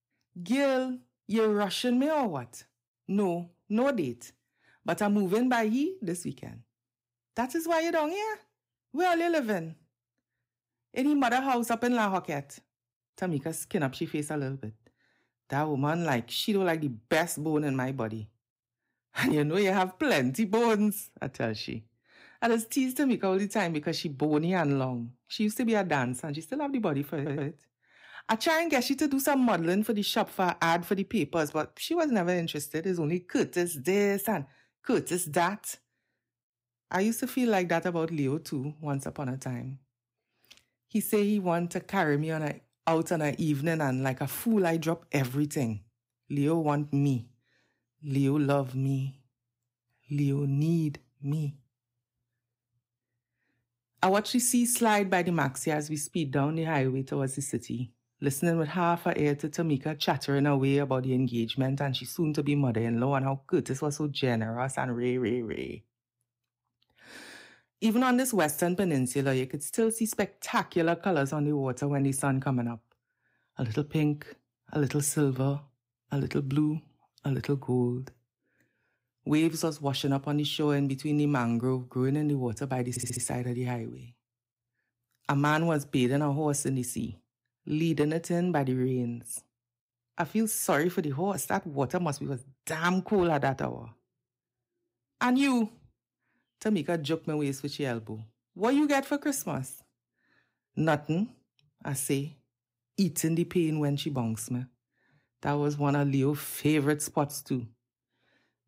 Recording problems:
audio stuttering; at 27 s and at 1:23

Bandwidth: 15.5 kHz